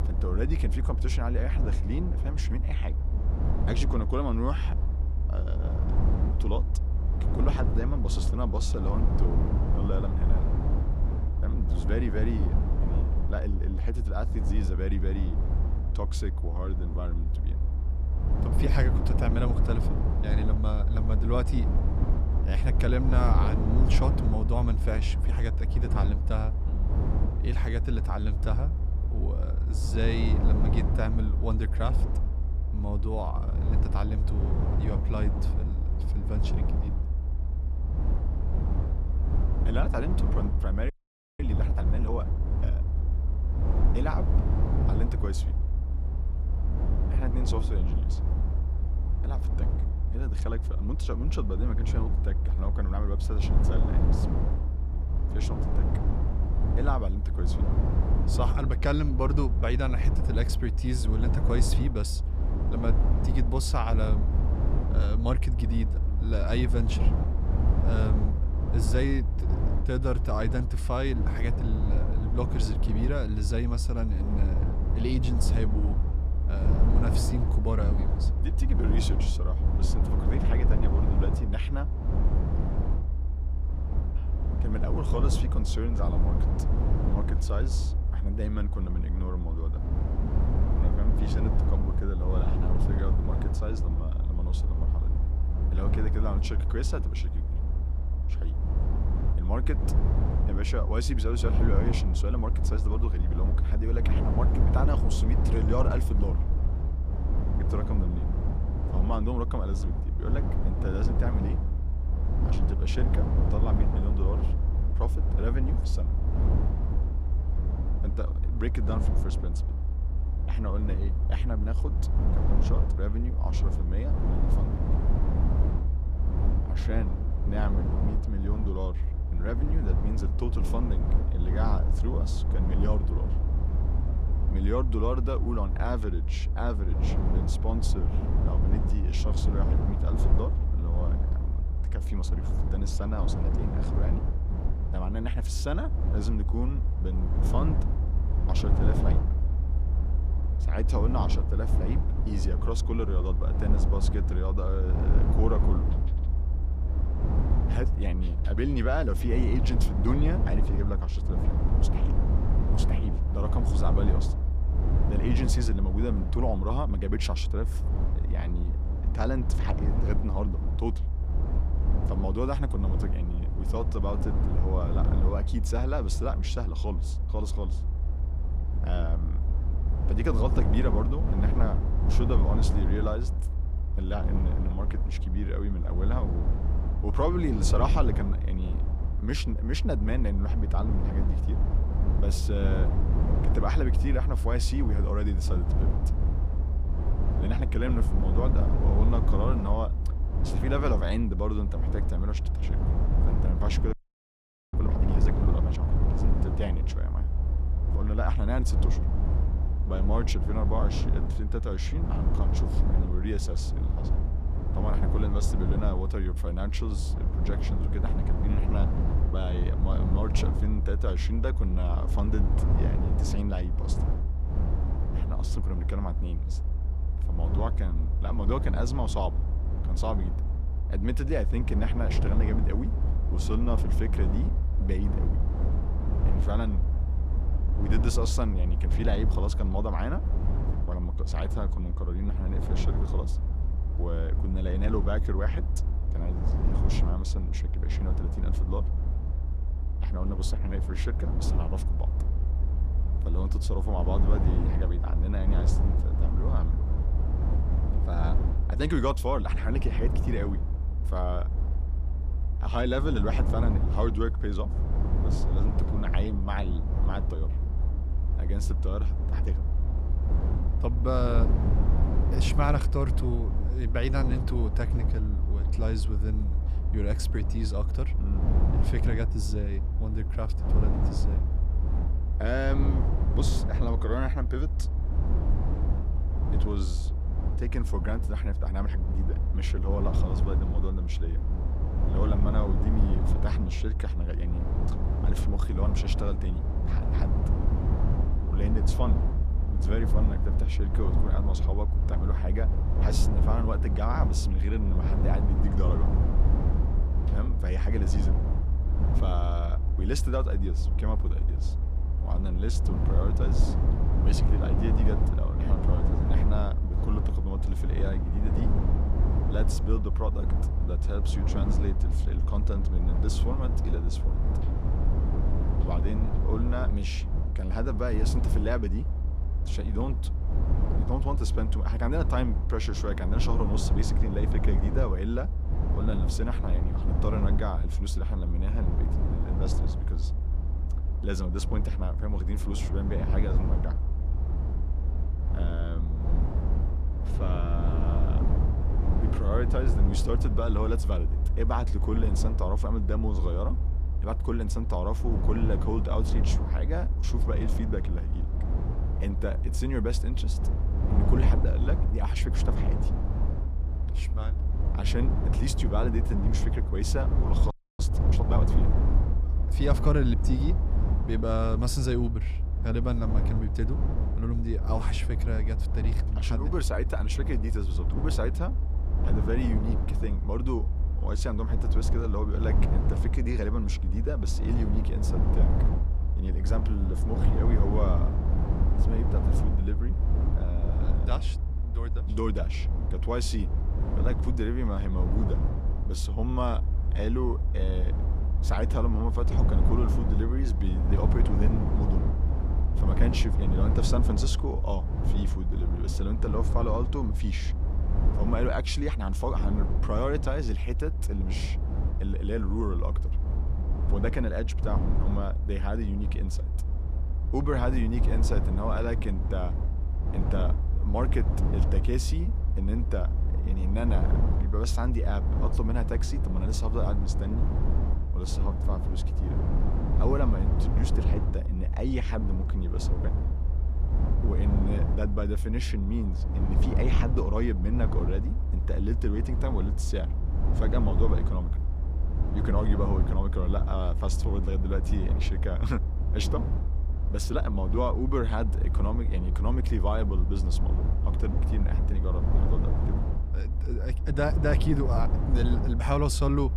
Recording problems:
low rumble; loud; throughout; 5 dB below the speech
audio freezing; at 41 s, at 3:24 for 1 s and at 6:08

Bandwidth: 14.5 kHz